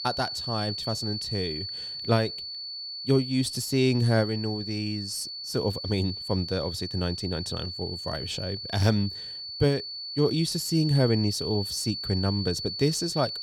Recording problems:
high-pitched whine; loud; throughout; 4.5 kHz, 5 dB below the speech

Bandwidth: 18.5 kHz